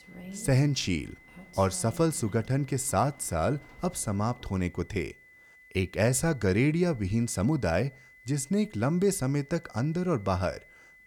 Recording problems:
high-pitched whine; faint; throughout; 2 kHz, 25 dB below the speech
rain or running water; faint; until 4.5 s; 20 dB below the speech

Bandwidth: 18.5 kHz